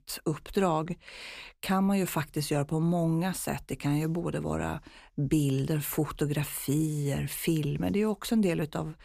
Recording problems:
none

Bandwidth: 15 kHz